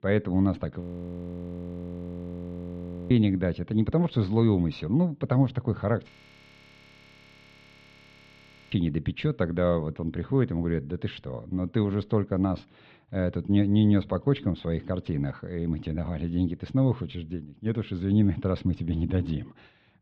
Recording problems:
muffled; very; fading above 3.5 kHz
audio freezing; at 1 s for 2.5 s and at 6 s for 2.5 s

